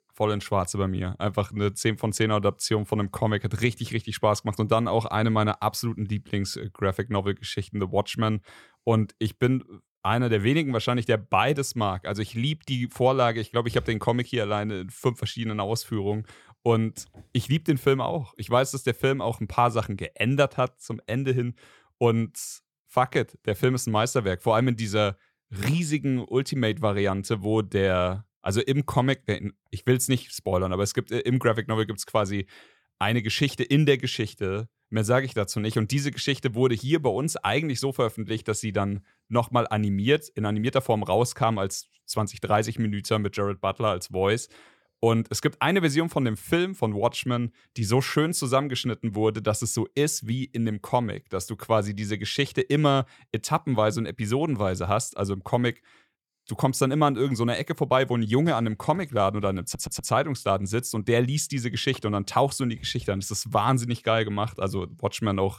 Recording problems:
audio stuttering; at 1:00

